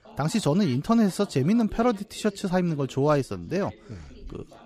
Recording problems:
background chatter; faint; throughout; 2 voices, 25 dB below the speech

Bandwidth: 15 kHz